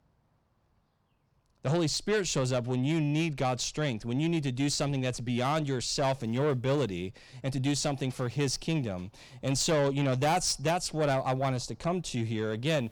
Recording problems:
distortion; slight; 10 dB below the speech

